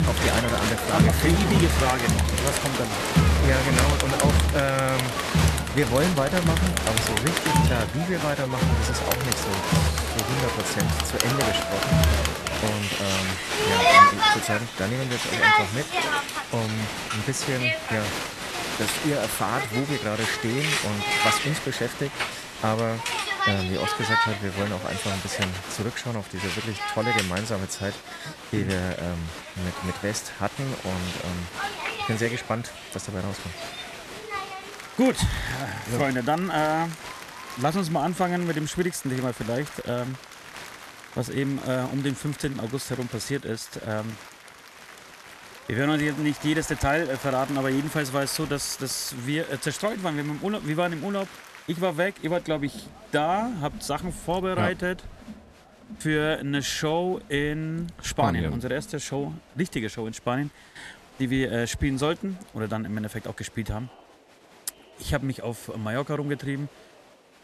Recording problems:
crowd noise; very loud; throughout; 3 dB above the speech

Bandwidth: 13.5 kHz